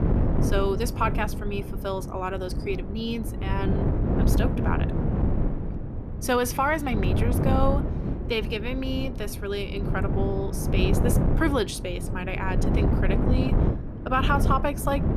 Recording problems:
wind noise on the microphone; heavy; 6 dB below the speech

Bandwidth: 14 kHz